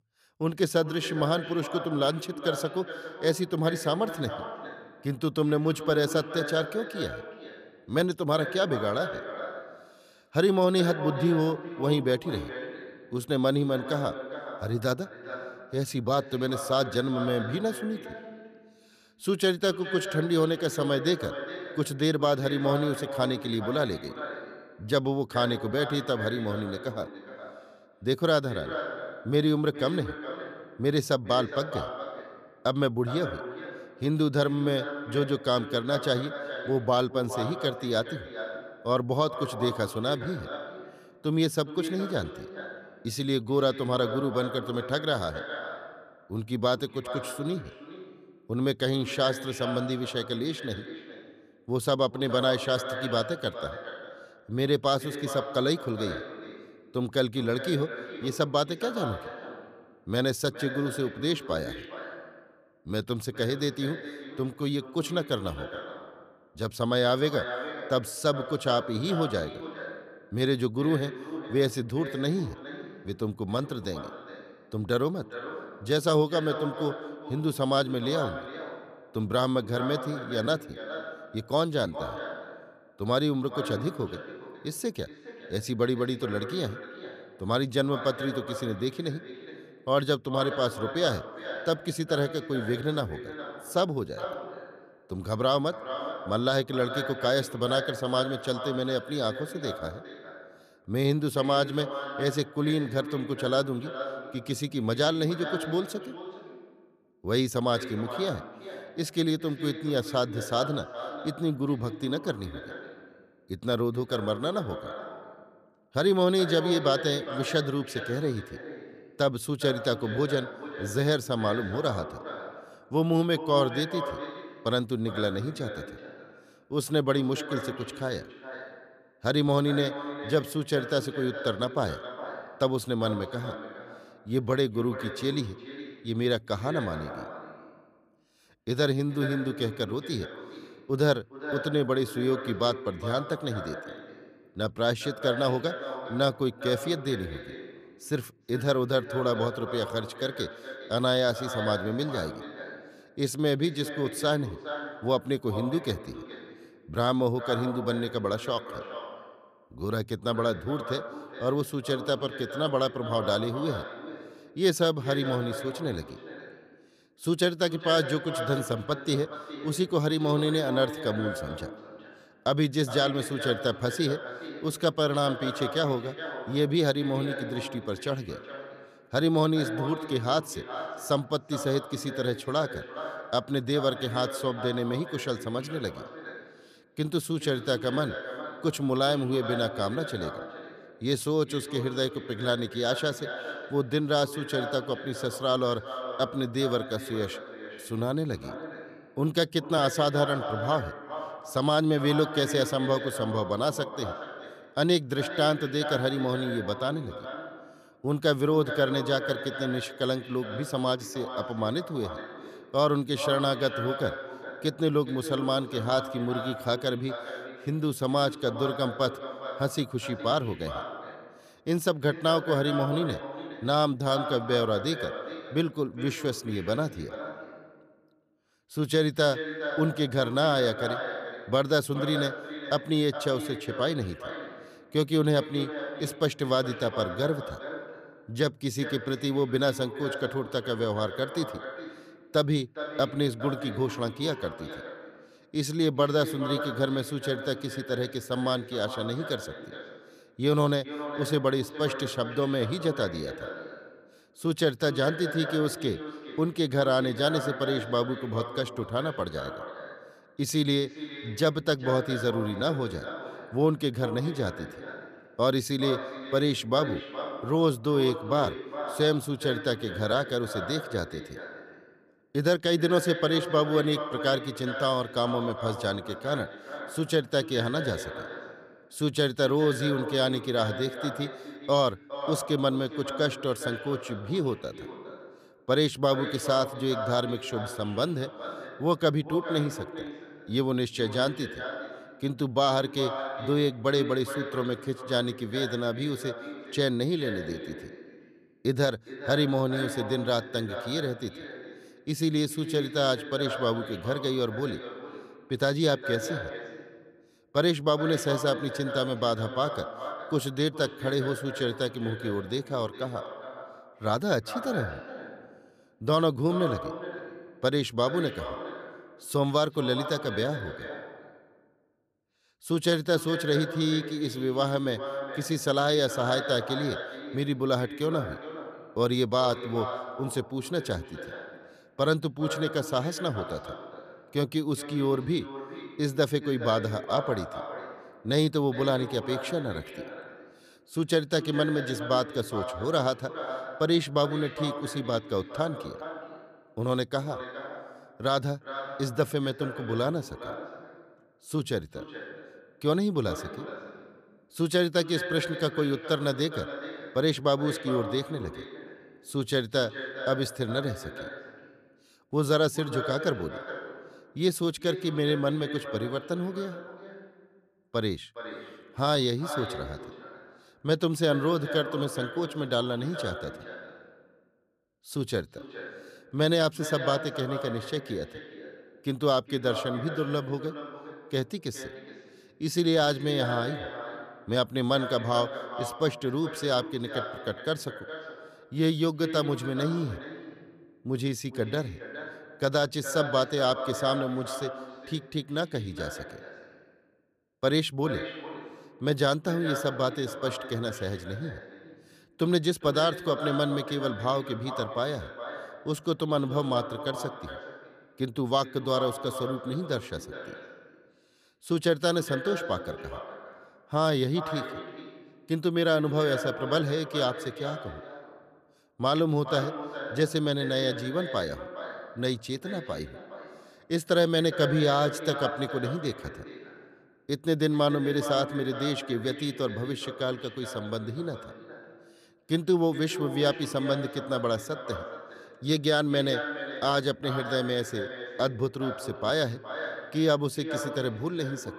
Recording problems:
echo of what is said; strong; throughout; 410 ms later, 10 dB below the speech

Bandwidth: 14.5 kHz